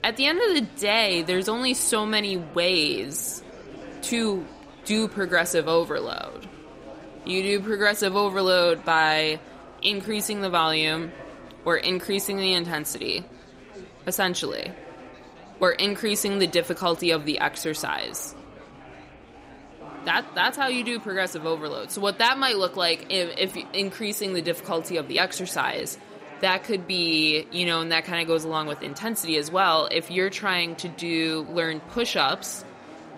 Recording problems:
murmuring crowd; noticeable; throughout; 20 dB below the speech

